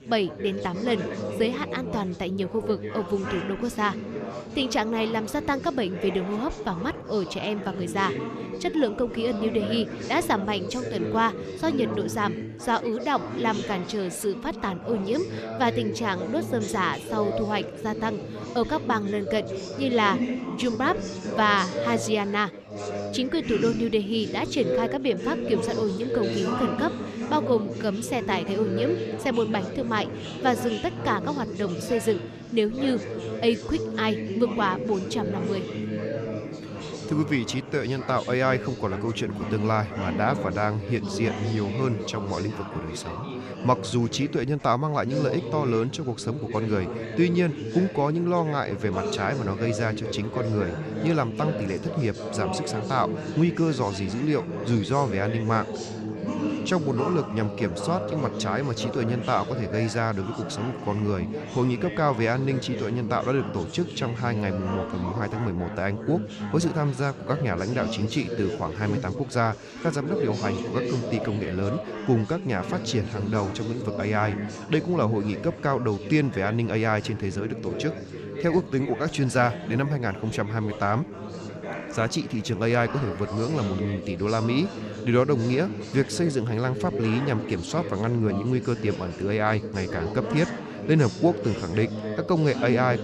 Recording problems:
chatter from many people; loud; throughout; 6 dB below the speech

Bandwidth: 14 kHz